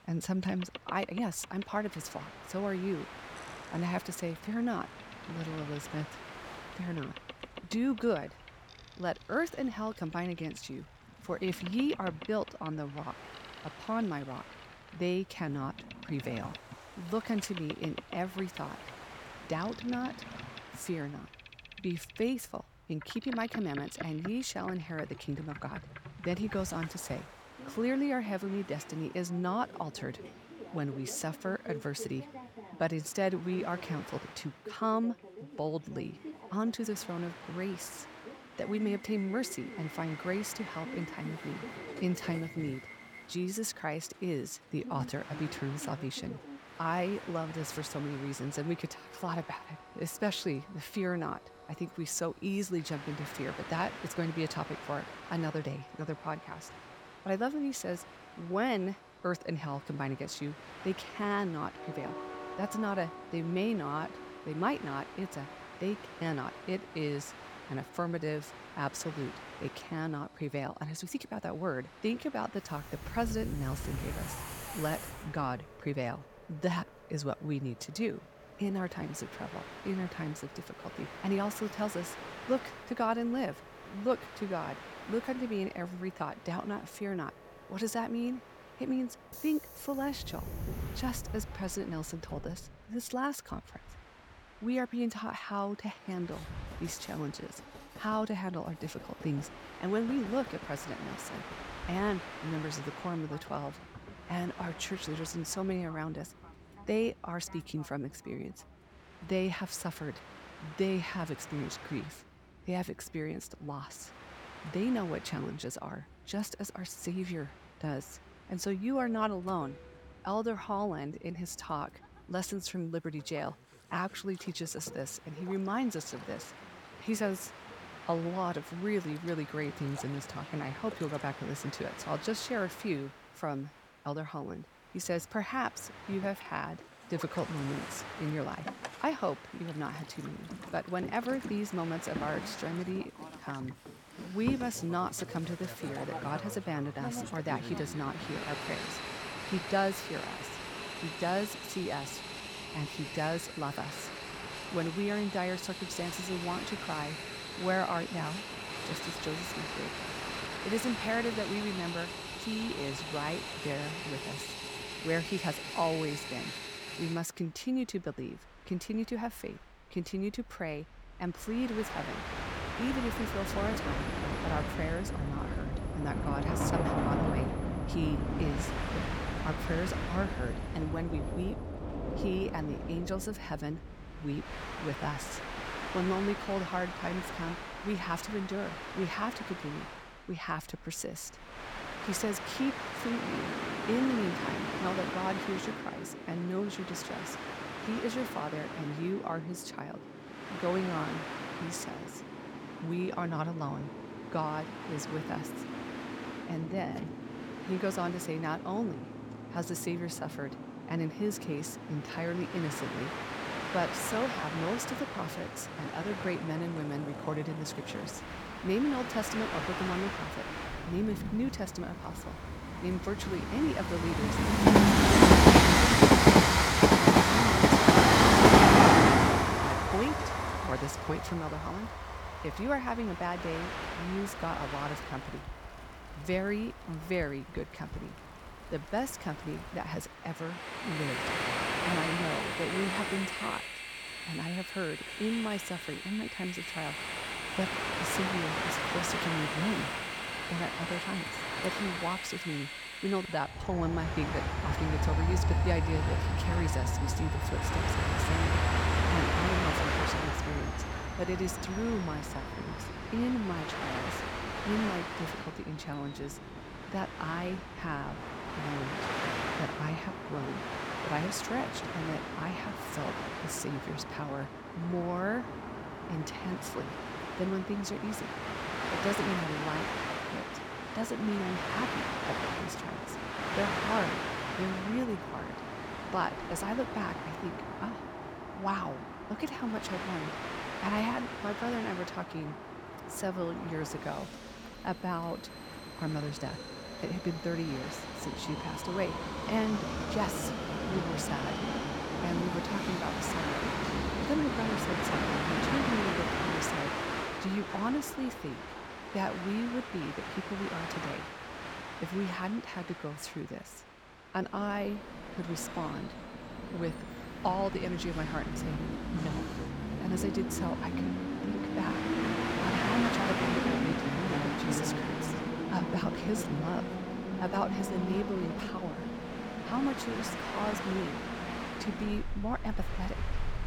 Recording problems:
train or aircraft noise; very loud; throughout; 3 dB above the speech

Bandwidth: 18.5 kHz